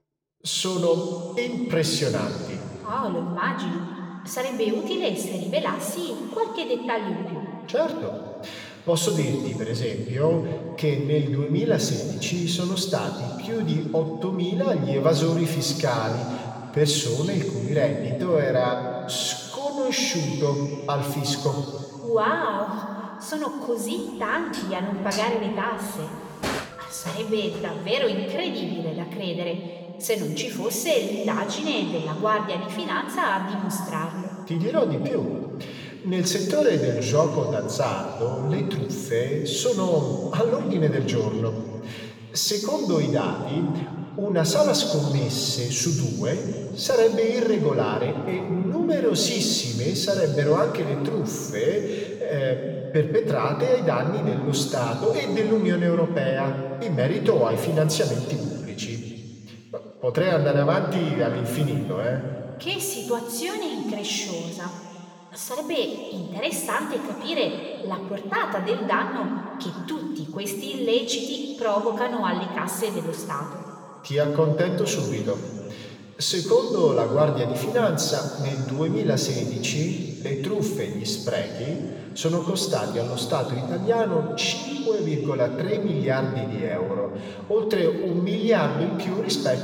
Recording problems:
room echo; noticeable; dies away in 2.6 s
off-mic speech; somewhat distant
clattering dishes; noticeable; from 25 to 28 s; peak 4 dB below the speech

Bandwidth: 18 kHz